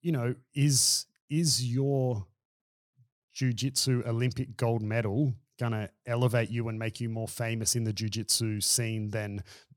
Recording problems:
none

